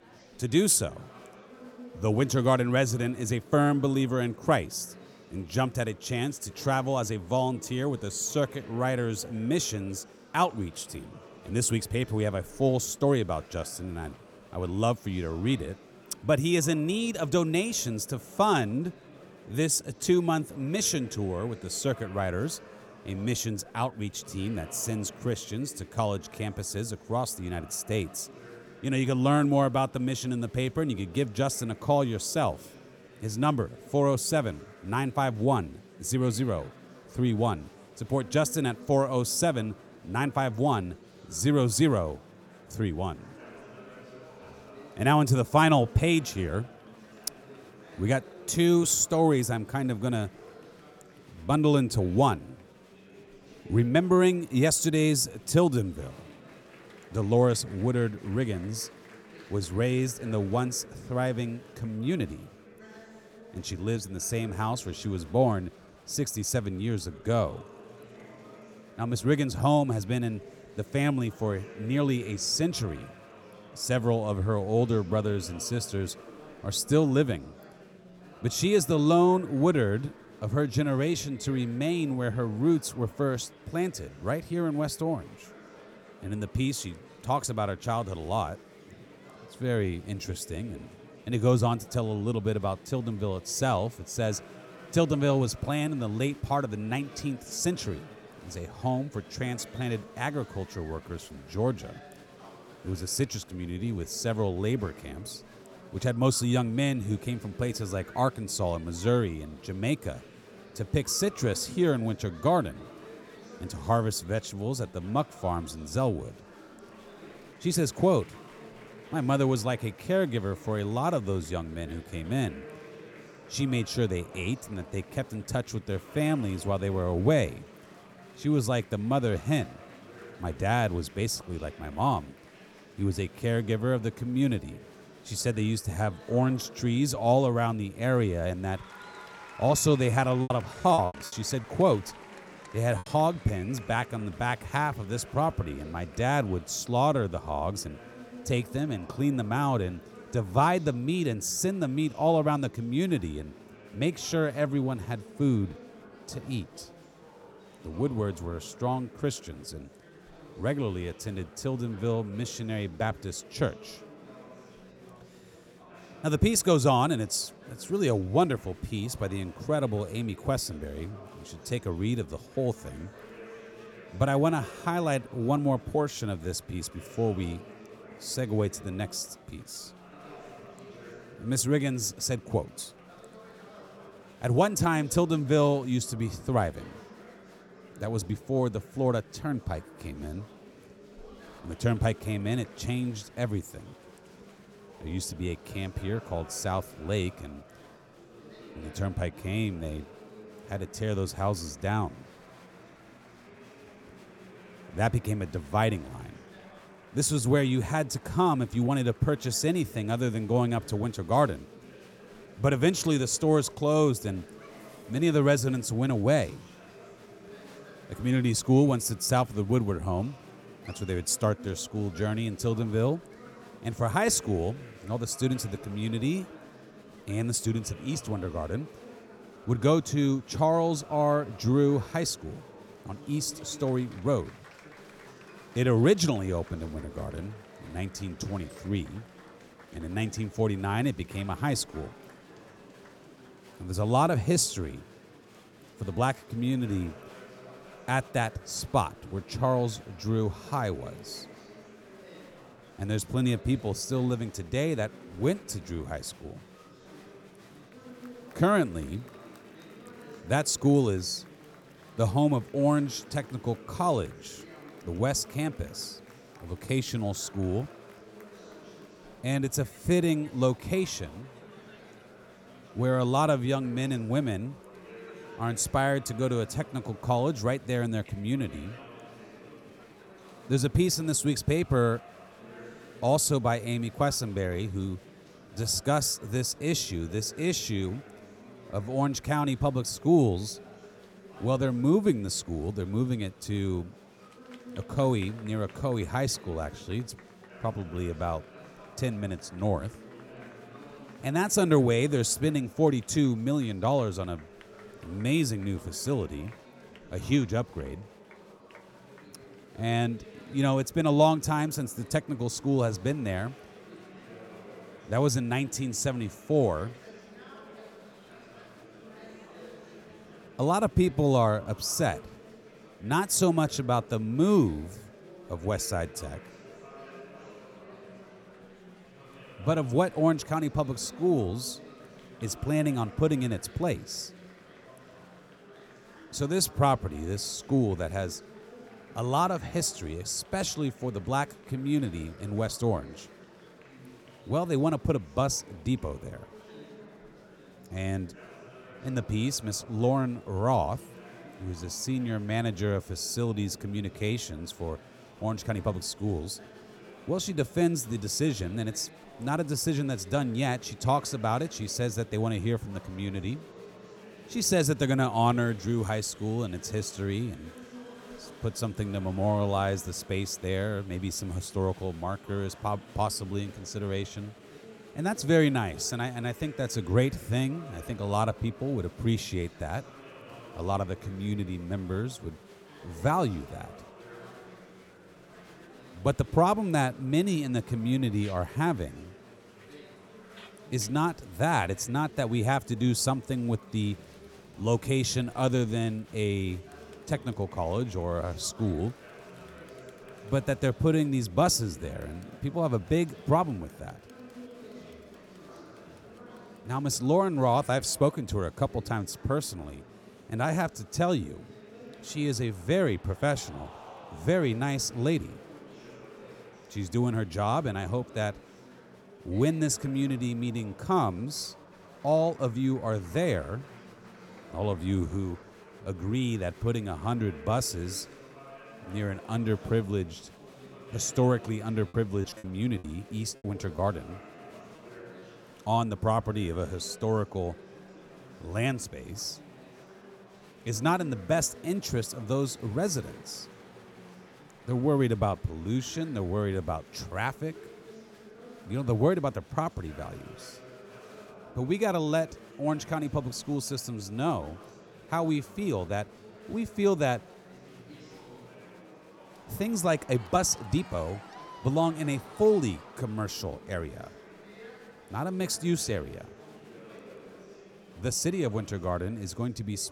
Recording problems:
murmuring crowd; faint; throughout; 20 dB below the speech
choppy; very; from 2:20 to 2:23 and from 7:13 to 7:14; 11% of the speech affected

